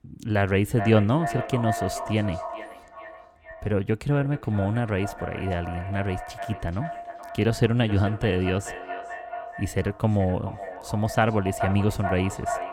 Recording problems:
echo of what is said; strong; throughout; 430 ms later, 10 dB below the speech

